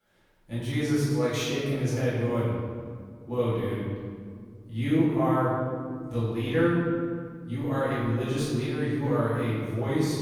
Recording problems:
room echo; strong; dies away in 1.9 s
off-mic speech; far

